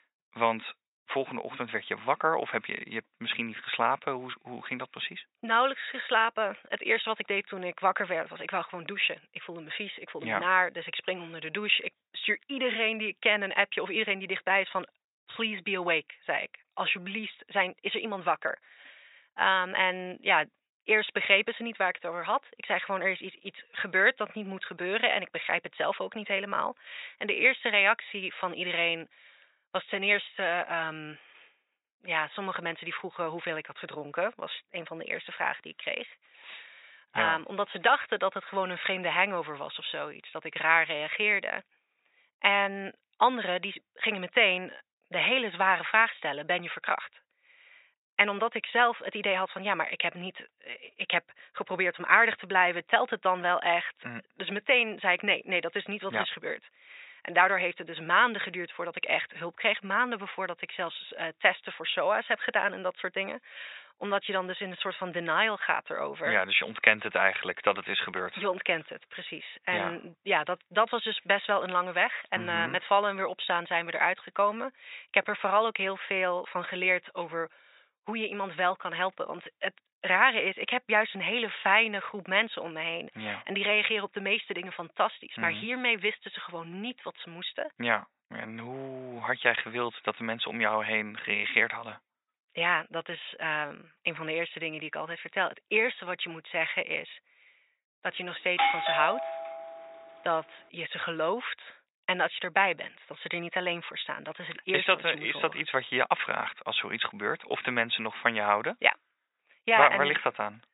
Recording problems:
thin; very; fading below 500 Hz
high frequencies cut off; severe; nothing above 4 kHz
doorbell; loud; from 1:39 to 1:40; peak 3 dB above the speech

